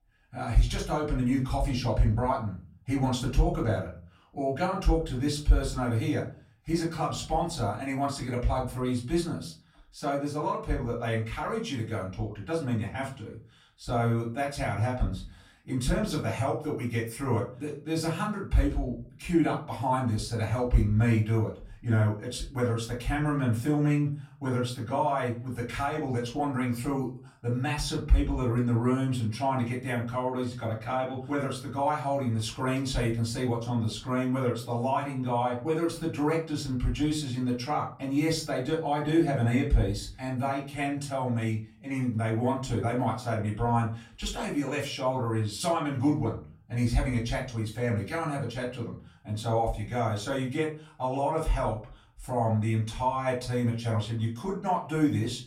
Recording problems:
off-mic speech; far
room echo; slight; dies away in 0.4 s

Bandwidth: 16.5 kHz